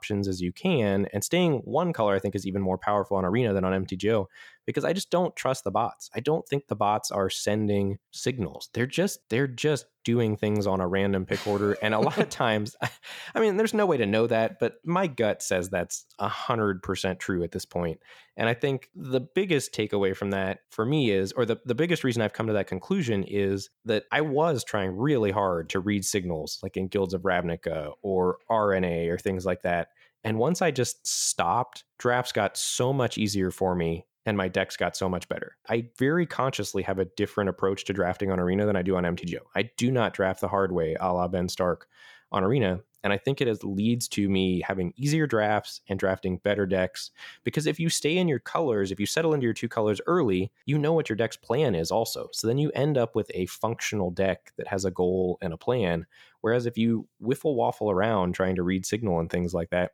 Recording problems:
none

